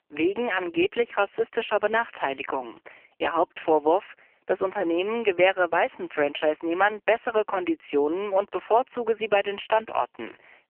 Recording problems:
phone-call audio; poor line; nothing above 3 kHz

